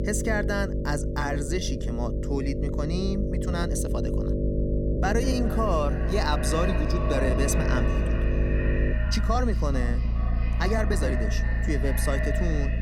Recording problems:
echo of what is said; strong; from 5 s on; 400 ms later, 7 dB below the speech
electrical hum; loud; until 9 s; 50 Hz, 5 dB below the speech
low rumble; noticeable; throughout; 15 dB below the speech
uneven, jittery; strongly; from 1 to 11 s

